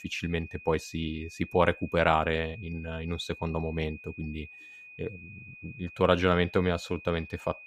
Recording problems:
high-pitched whine; noticeable; throughout; 2.5 kHz, 15 dB below the speech

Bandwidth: 15 kHz